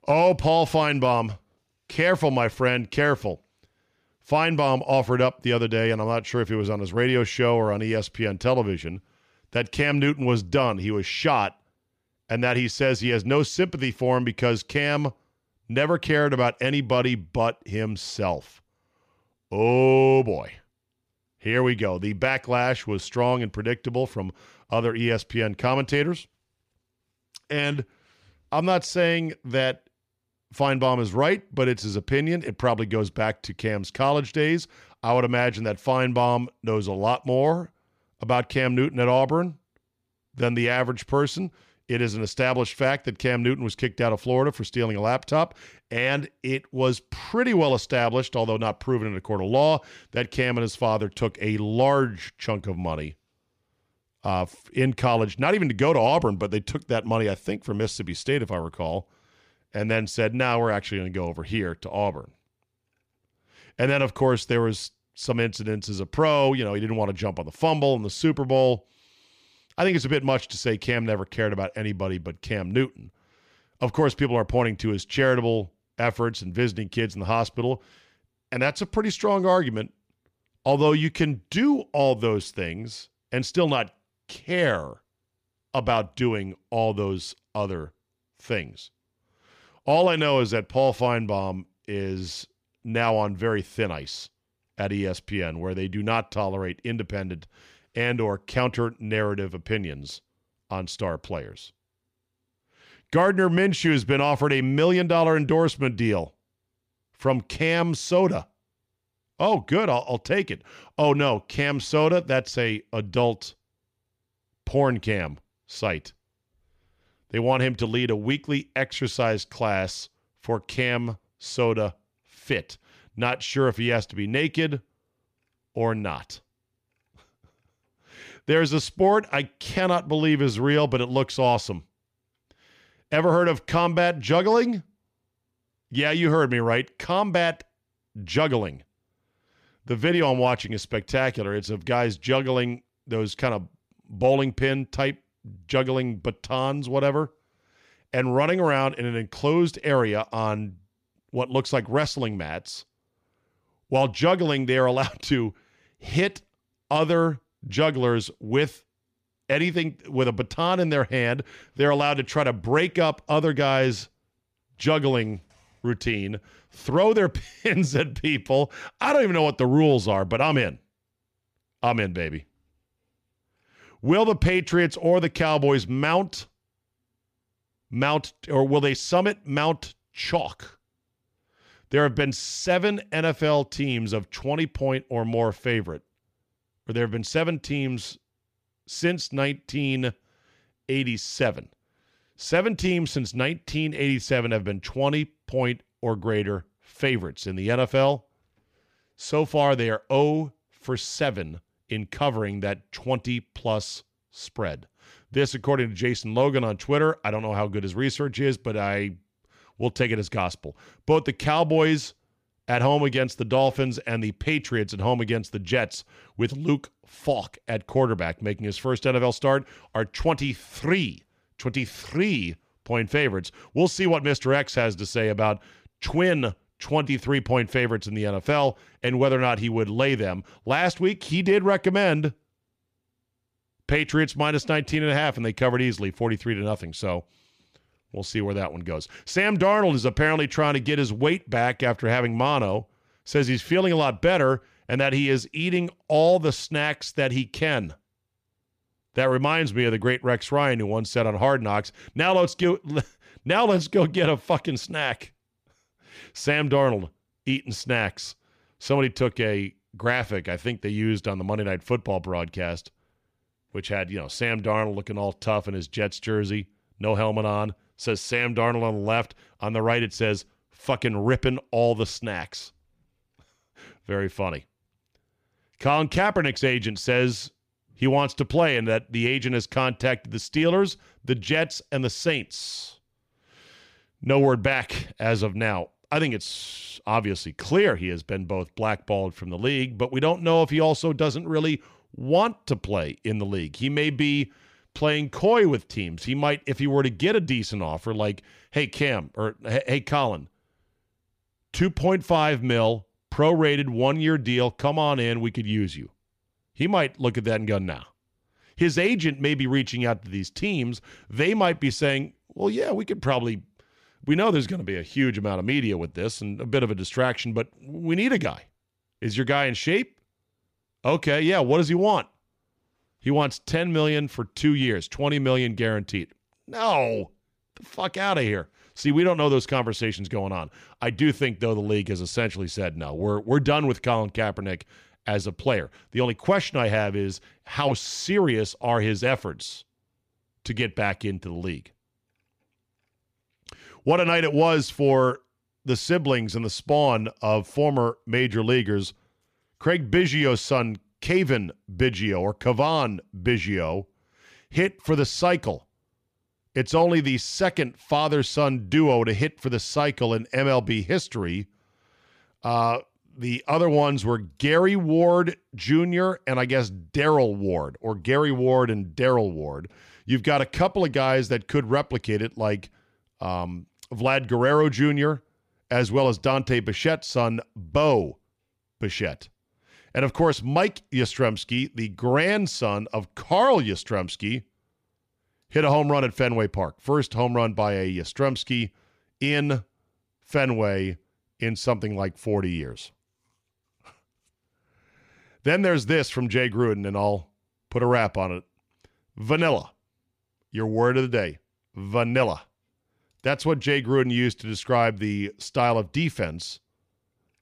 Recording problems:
none

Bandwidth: 15 kHz